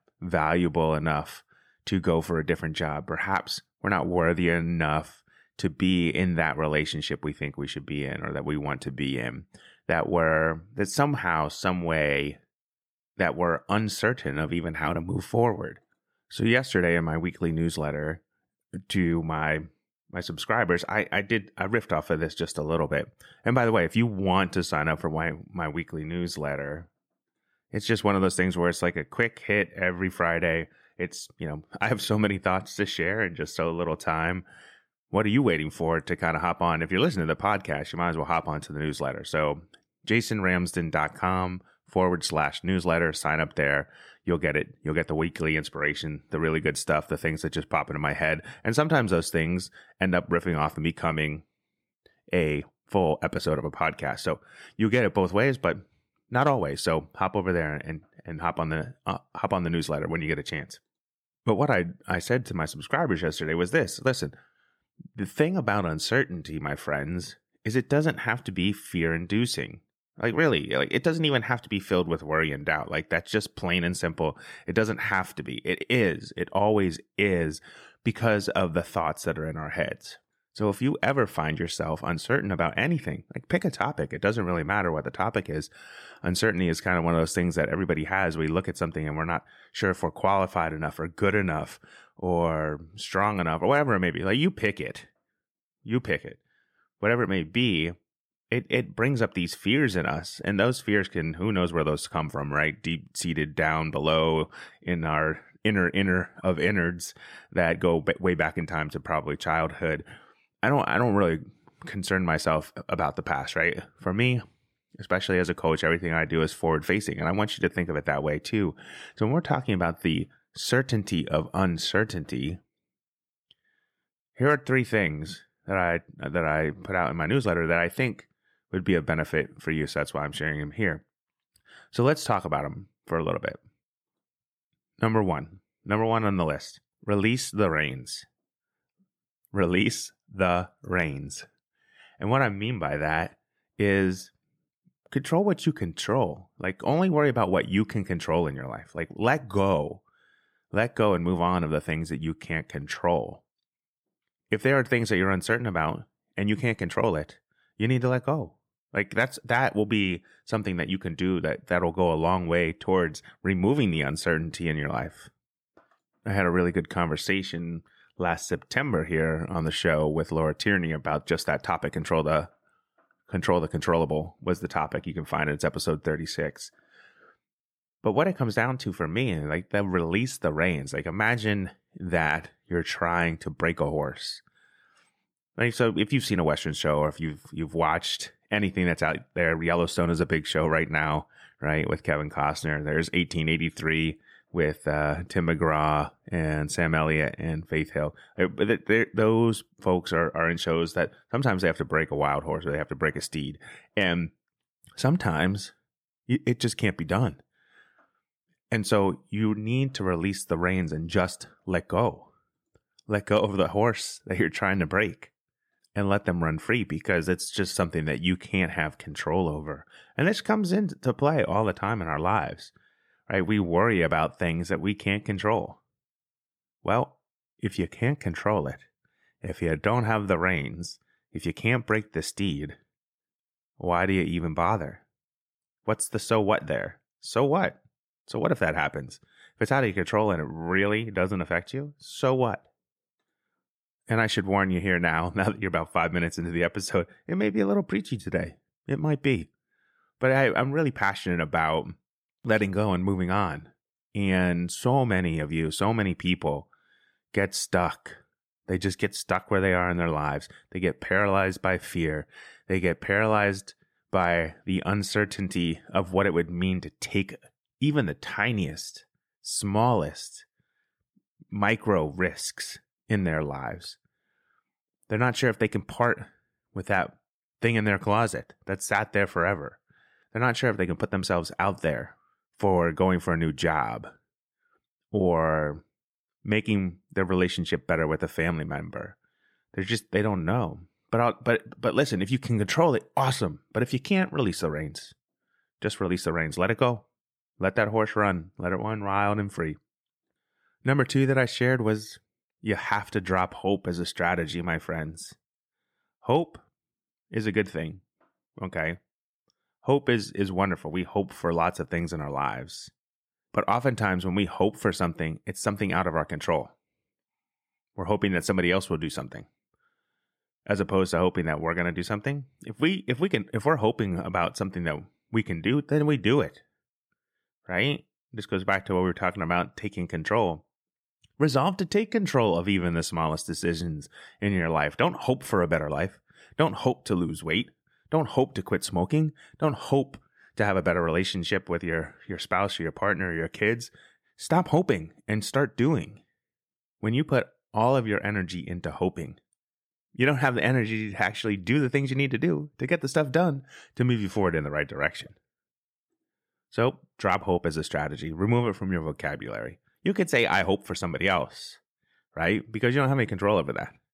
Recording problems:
none

